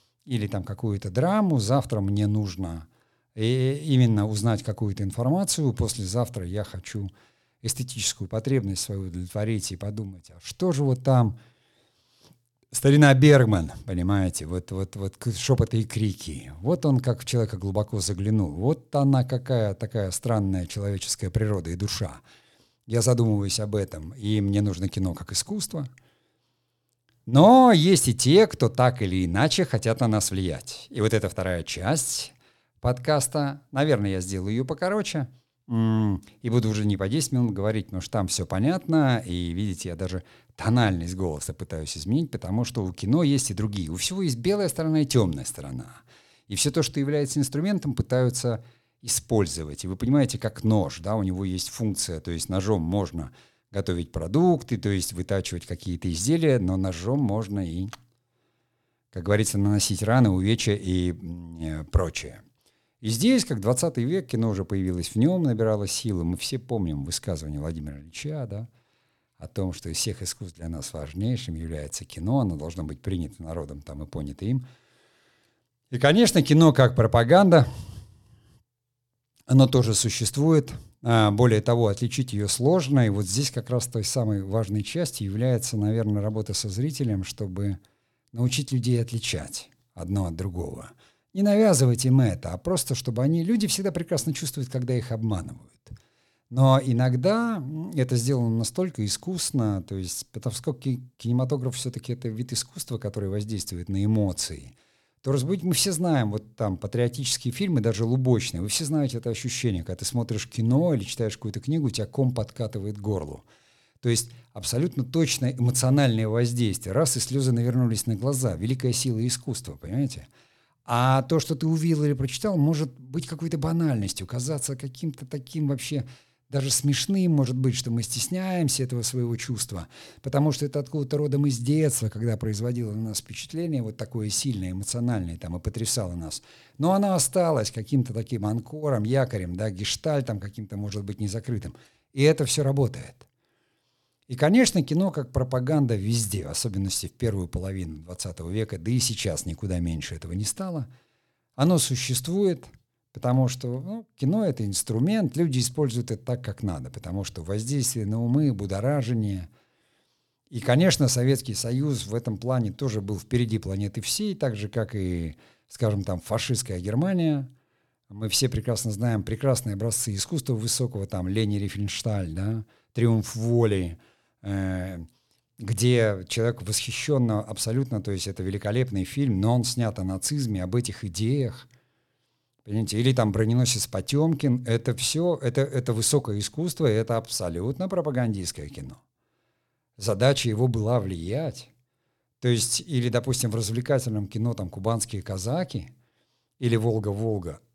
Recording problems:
none

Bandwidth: 18 kHz